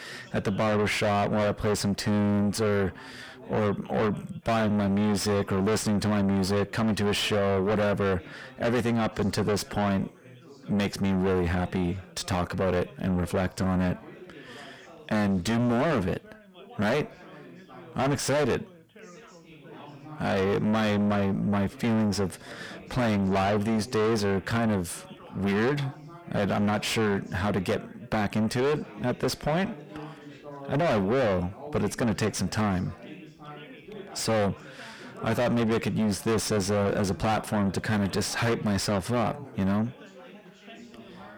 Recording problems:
distortion; heavy; 5 dB below the speech
background chatter; faint; throughout; 4 voices, 20 dB below the speech

